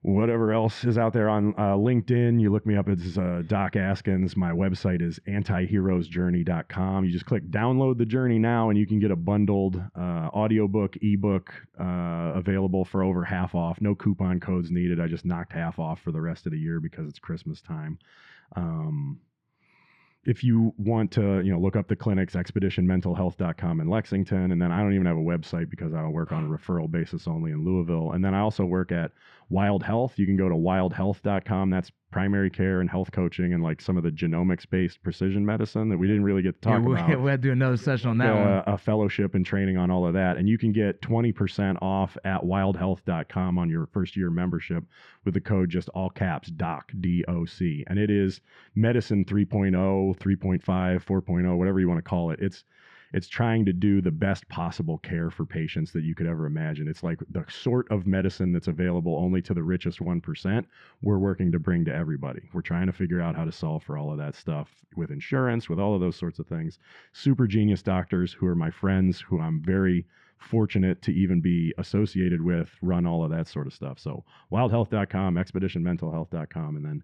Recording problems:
muffled; slightly; fading above 2.5 kHz

